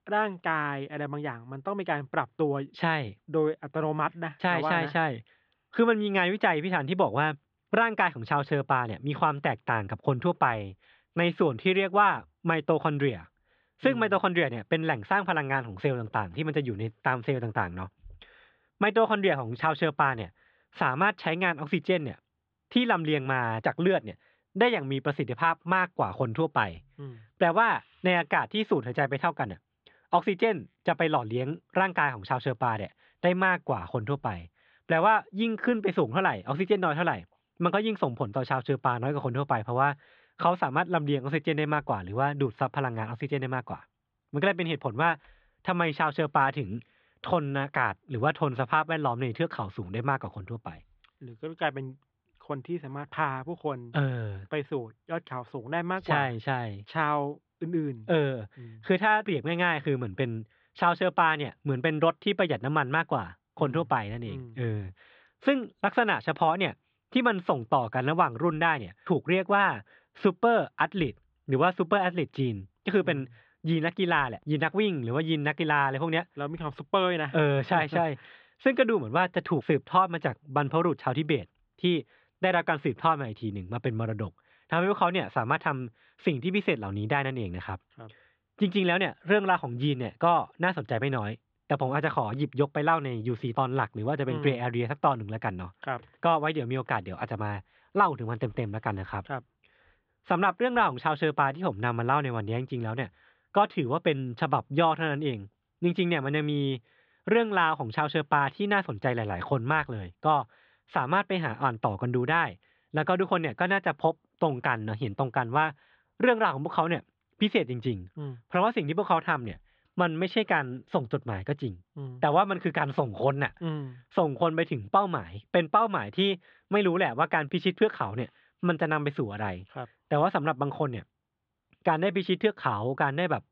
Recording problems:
muffled; very; fading above 3.5 kHz

